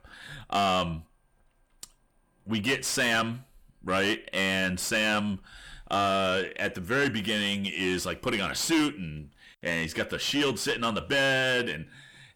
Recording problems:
distortion; heavy; 6 dB below the speech

